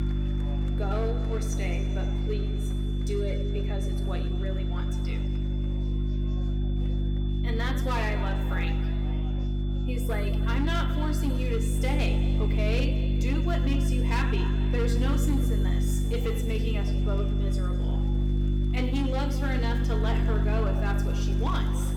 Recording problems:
room echo; noticeable; dies away in 1.8 s
distortion; slight; 5% of the sound clipped
off-mic speech; somewhat distant
electrical hum; loud; throughout; 50 Hz, 5 dB below the speech
high-pitched whine; noticeable; throughout; 3.5 kHz, 15 dB below the speech
chatter from many people; noticeable; throughout; 15 dB below the speech

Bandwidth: 17 kHz